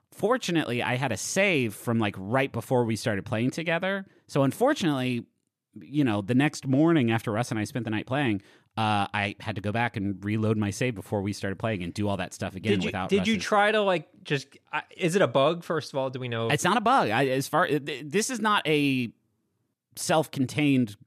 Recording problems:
none

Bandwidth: 14 kHz